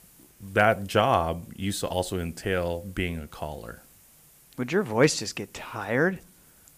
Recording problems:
hiss; faint; throughout; 25 dB below the speech

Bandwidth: 15 kHz